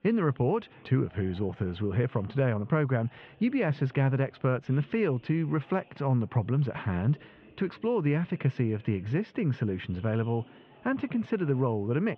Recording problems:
muffled; very; fading above 3.5 kHz
chatter from many people; faint; throughout; 30 dB below the speech

